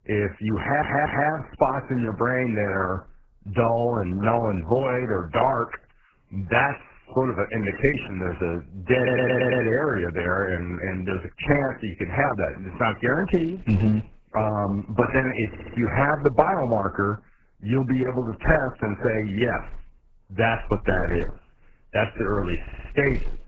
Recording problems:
garbled, watery; badly; nothing above 7.5 kHz
audio stuttering; 4 times, first at 0.5 s

